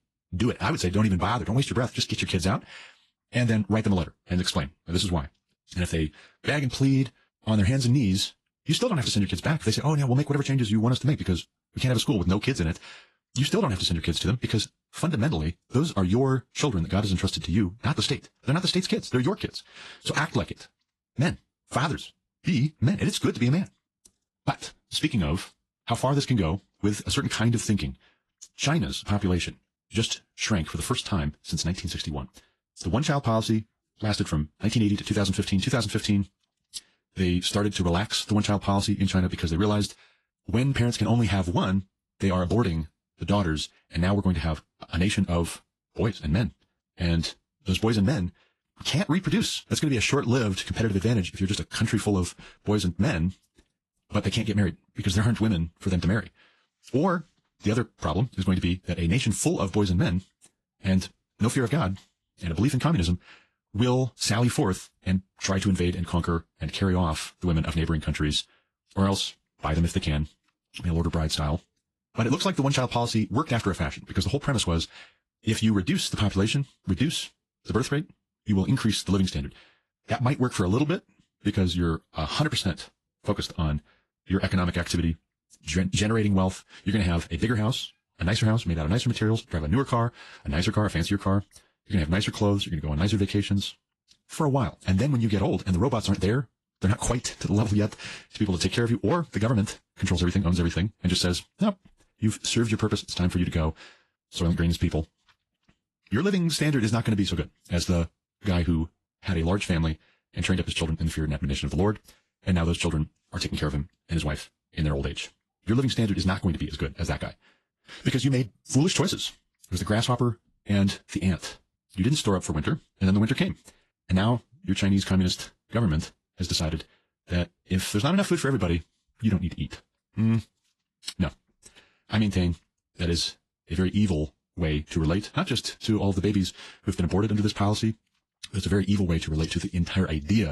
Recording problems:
wrong speed, natural pitch; too fast; 1.5 times normal speed
garbled, watery; slightly; nothing above 11.5 kHz
abrupt cut into speech; at the end

